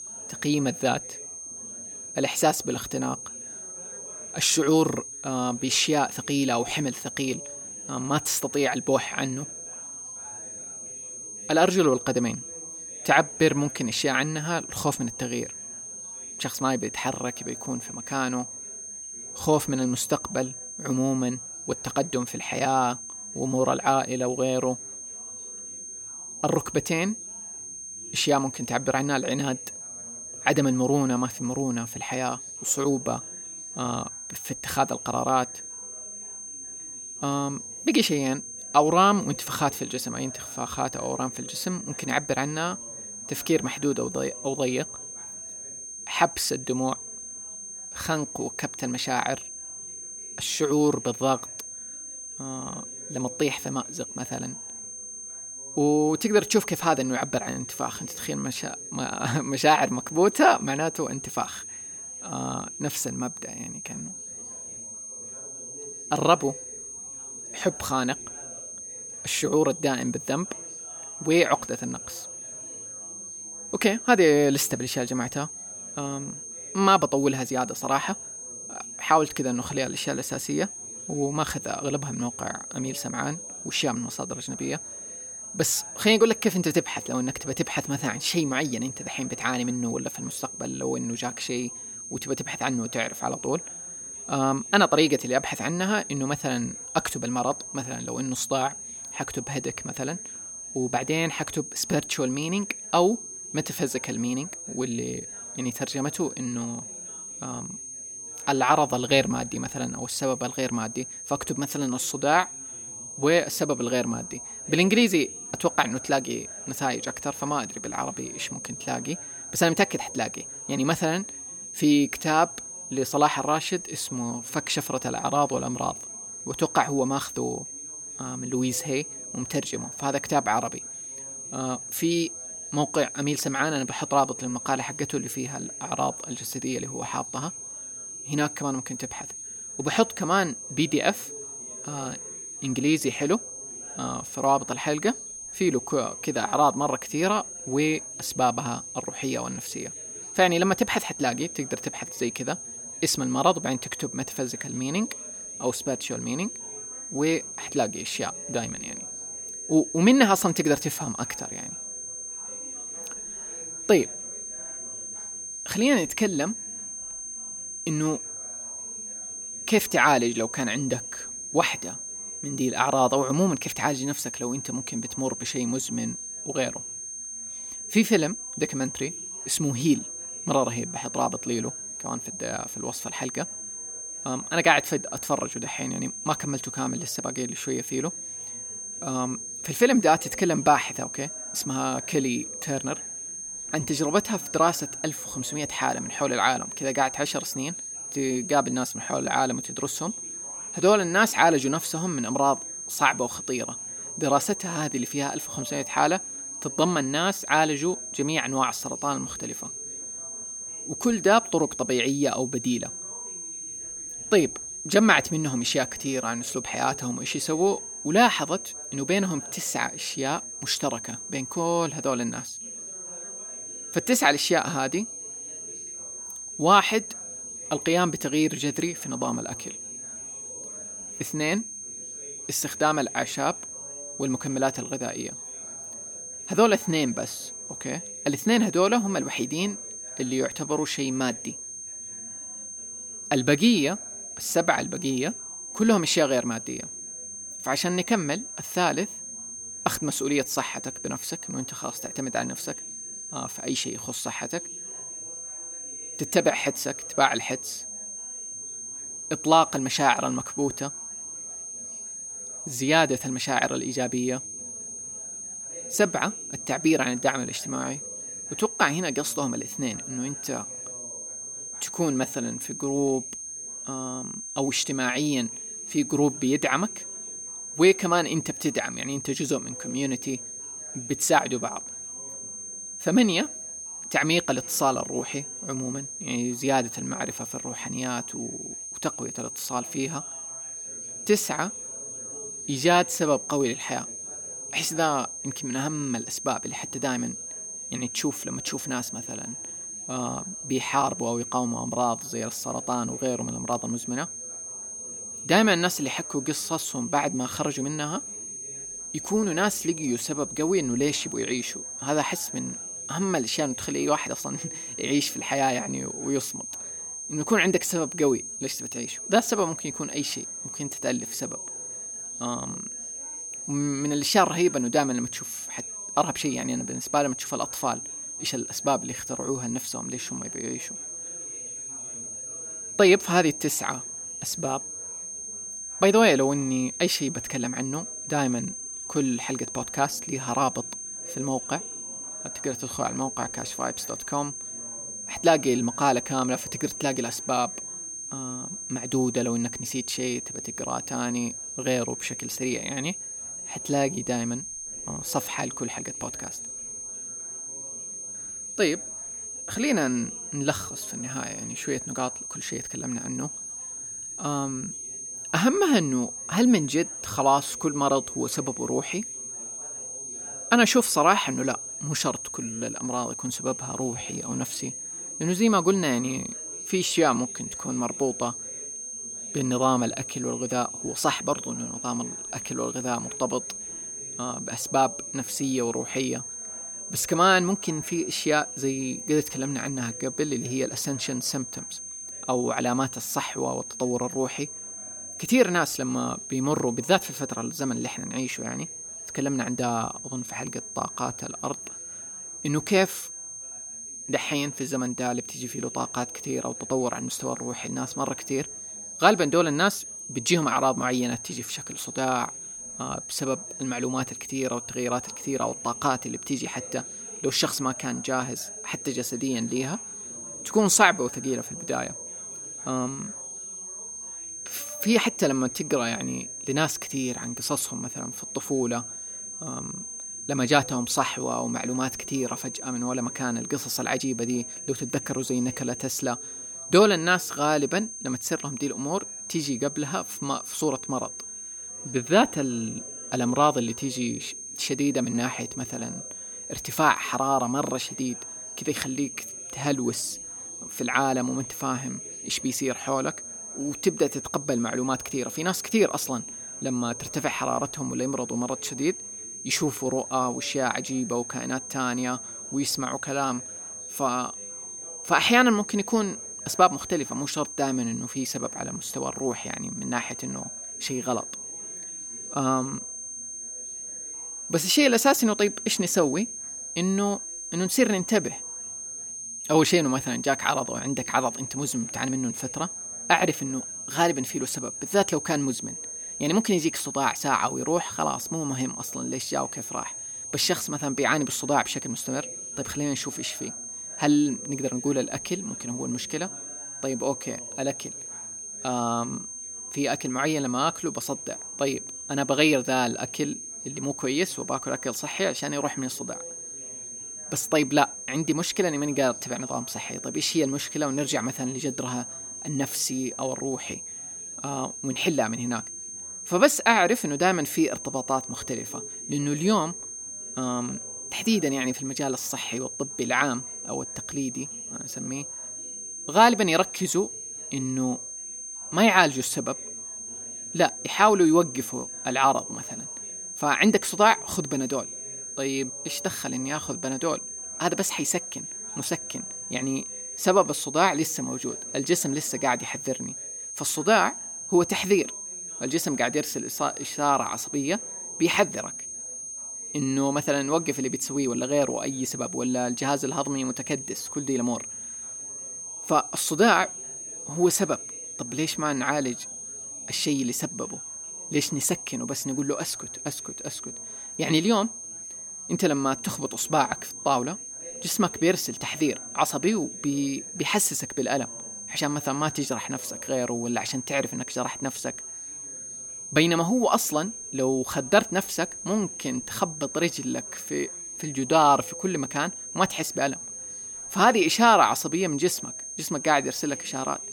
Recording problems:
high-pitched whine; loud; throughout; 6.5 kHz, 8 dB below the speech
background chatter; faint; throughout; 3 voices, 25 dB below the speech

